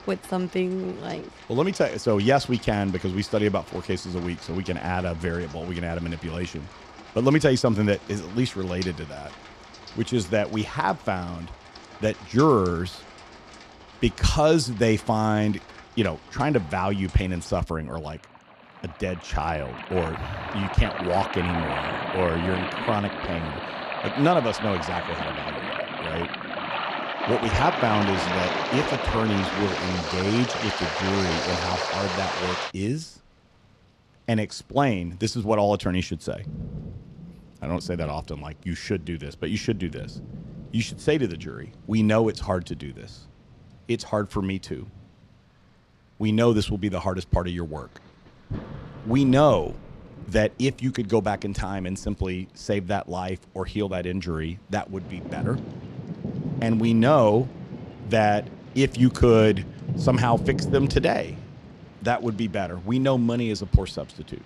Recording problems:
rain or running water; loud; throughout; 7 dB below the speech

